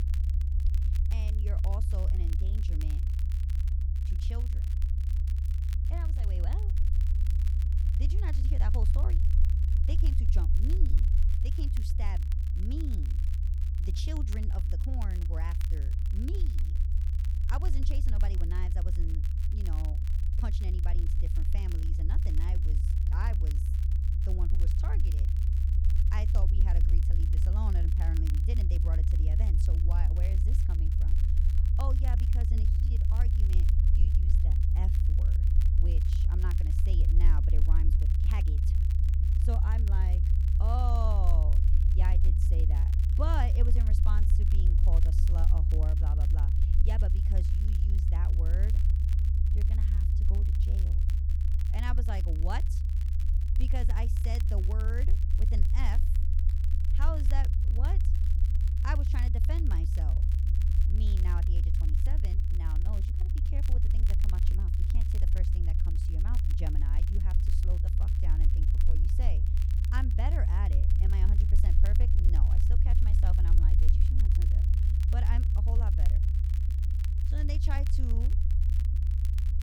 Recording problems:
low rumble; loud; throughout; 2 dB below the speech
crackle, like an old record; noticeable; 10 dB below the speech

